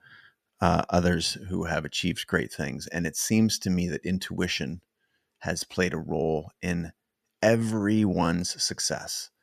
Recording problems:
none

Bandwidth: 14.5 kHz